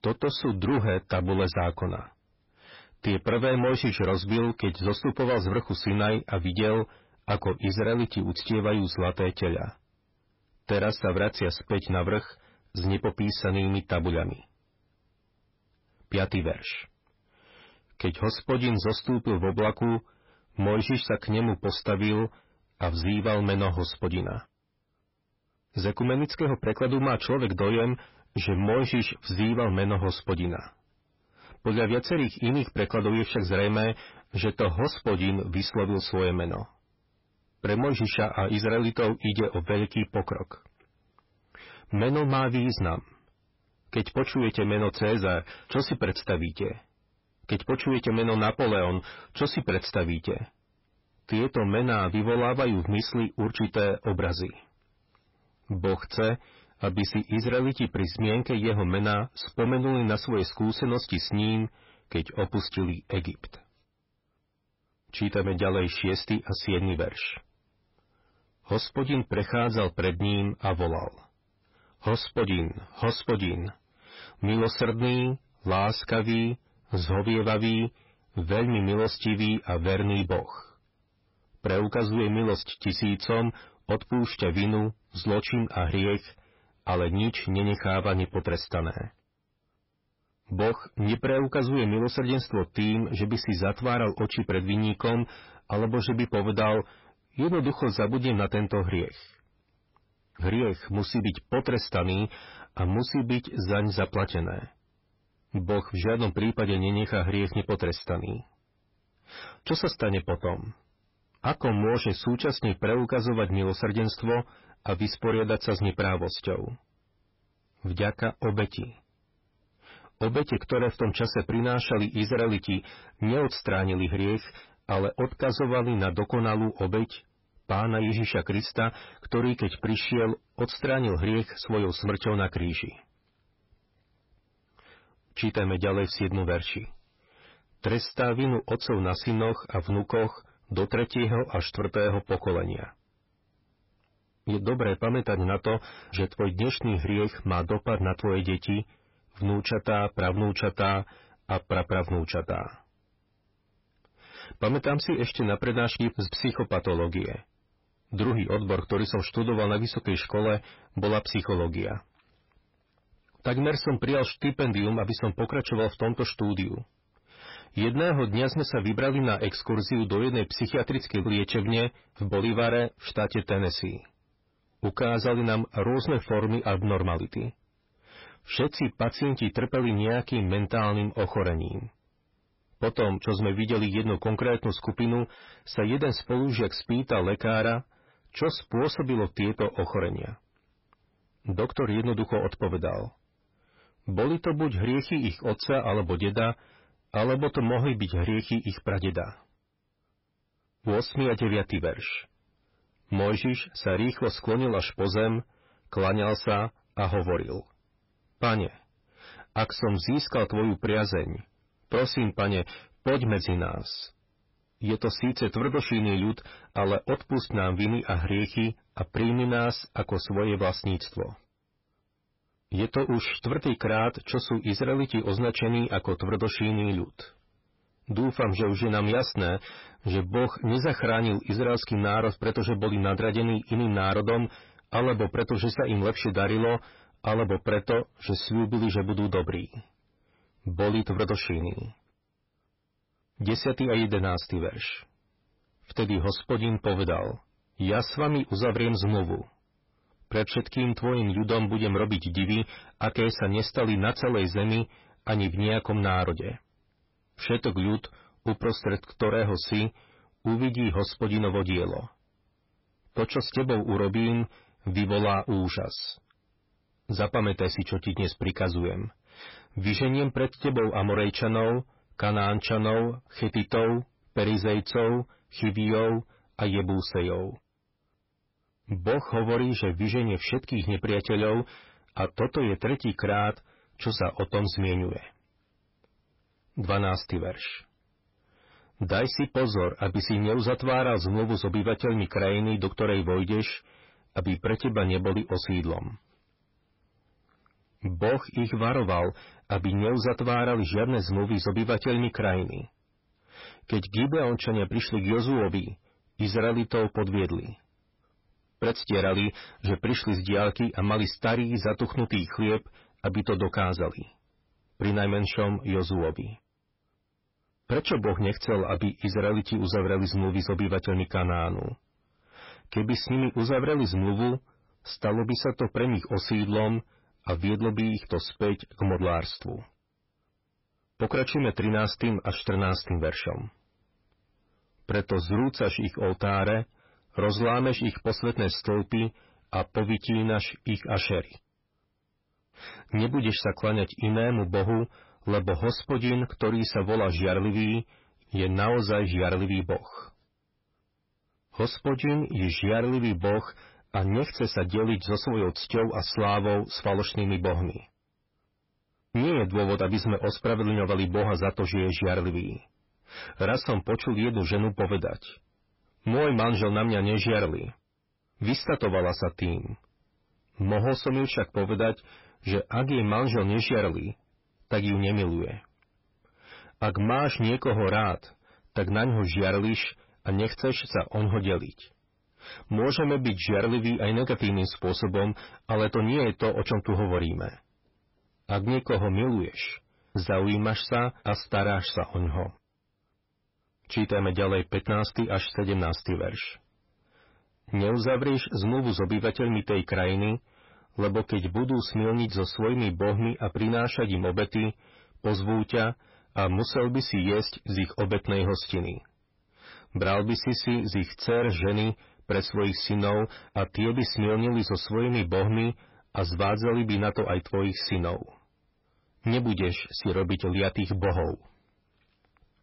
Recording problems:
distortion; heavy; 8 dB below the speech
garbled, watery; badly; nothing above 5.5 kHz

